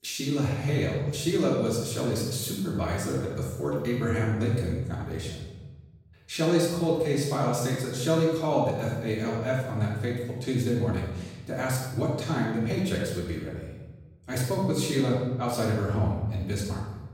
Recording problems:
off-mic speech; far
room echo; noticeable; dies away in 1.1 s

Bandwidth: 16 kHz